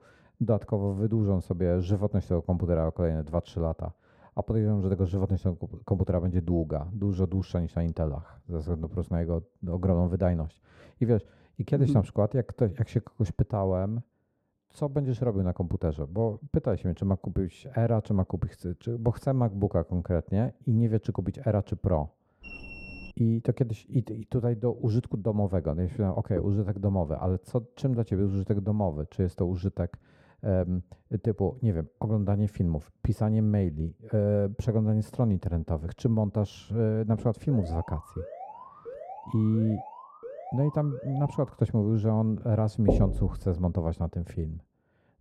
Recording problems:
muffled; very; fading above 1.5 kHz
alarm; faint; at 22 s and from 37 to 41 s; peak 15 dB below the speech
door banging; loud; at 43 s; peak 2 dB above the speech

